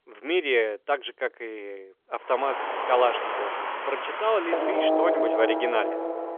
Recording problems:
phone-call audio; nothing above 3.5 kHz
traffic noise; loud; from 2.5 s on; as loud as the speech

